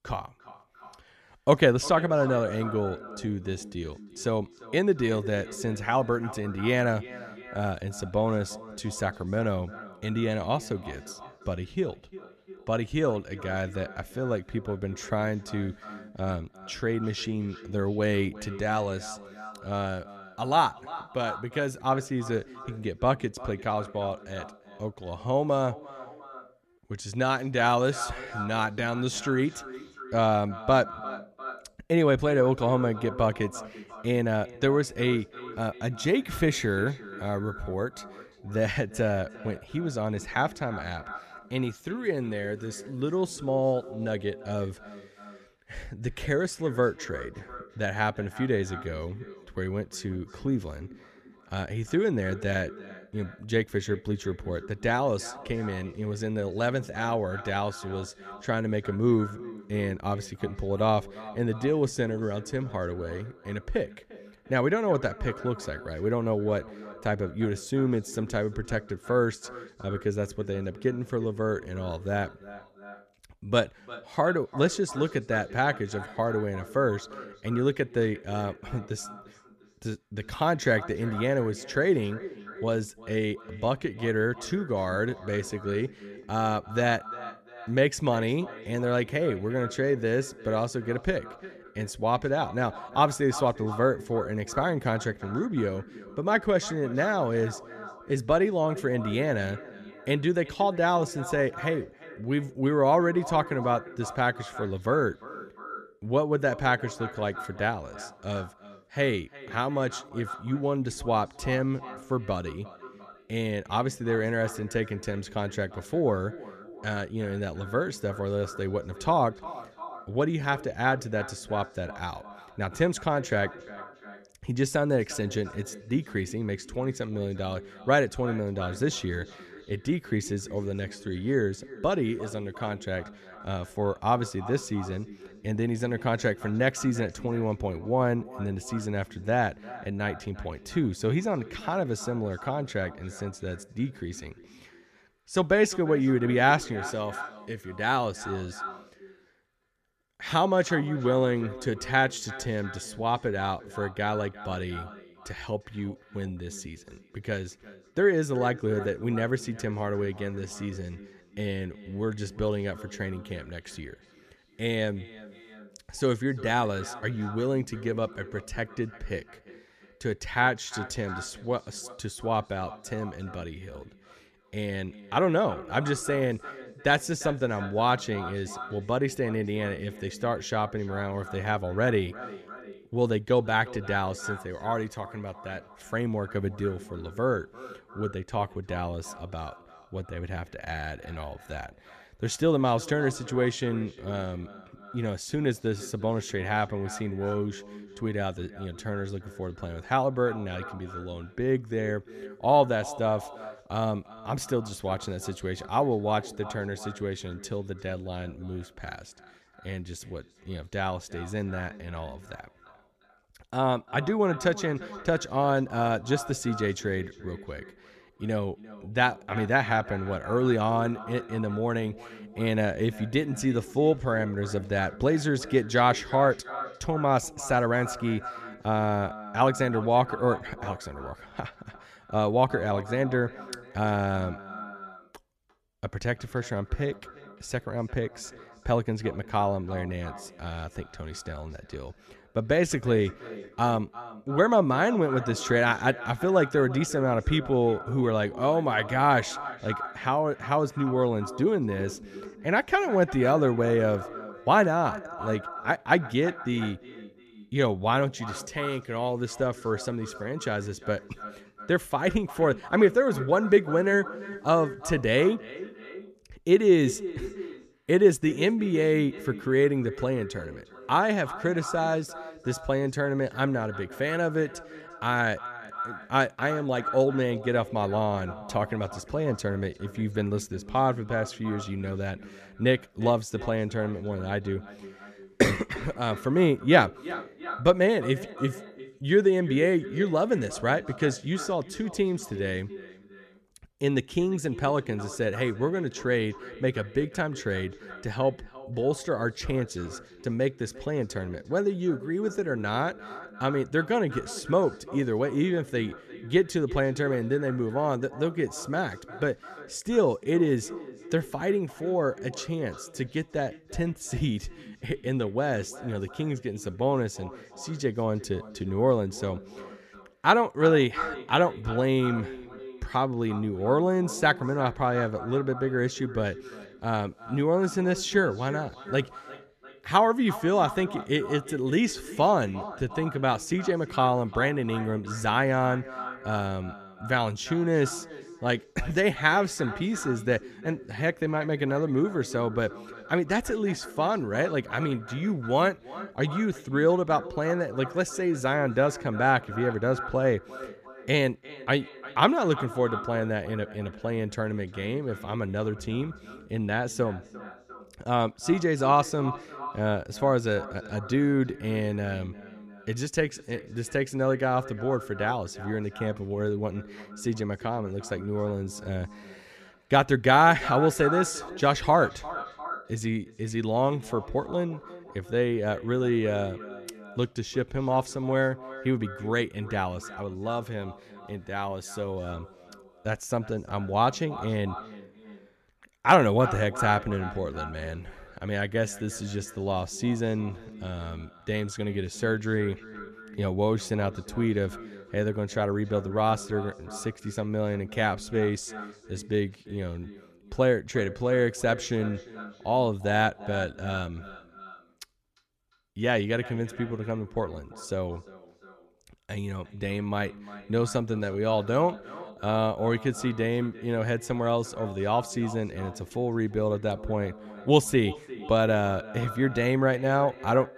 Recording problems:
echo of what is said; noticeable; throughout; 350 ms later, 15 dB below the speech

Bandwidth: 14 kHz